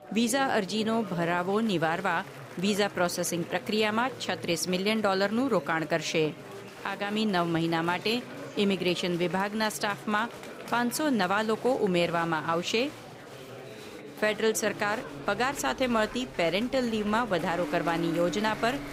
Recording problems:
traffic noise; noticeable; from 15 s on; 15 dB below the speech
chatter from many people; noticeable; throughout; 15 dB below the speech

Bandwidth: 15.5 kHz